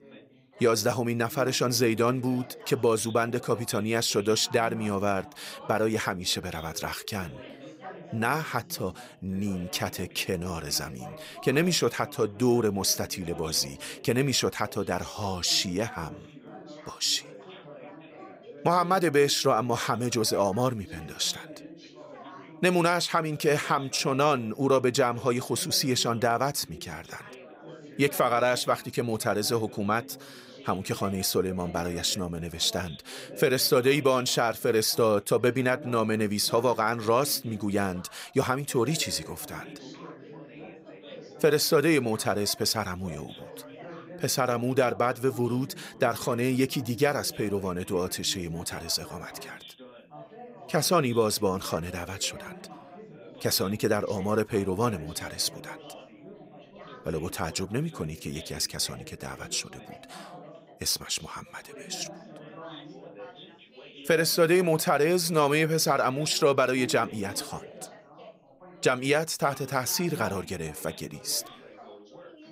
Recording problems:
background chatter; noticeable; throughout; 3 voices, 20 dB below the speech

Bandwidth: 15.5 kHz